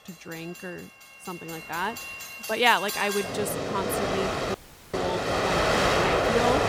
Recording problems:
train or aircraft noise; very loud; throughout; 2 dB above the speech
audio cutting out; at 4.5 s

